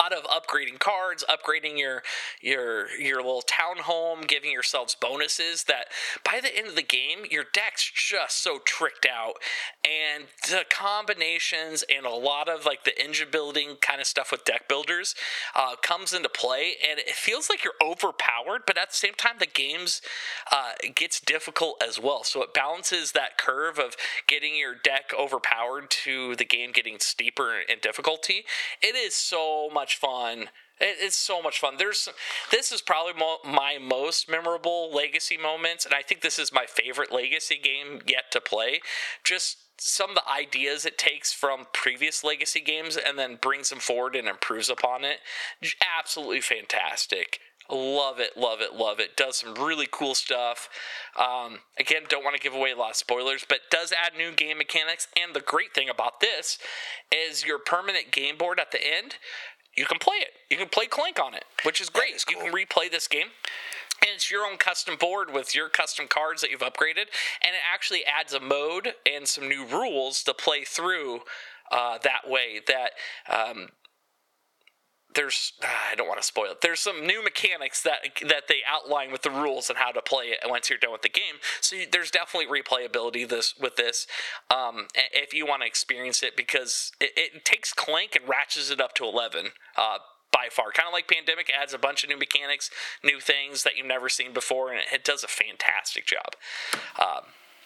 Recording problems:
thin; very; fading below 550 Hz
squashed, flat; somewhat
abrupt cut into speech; at the start

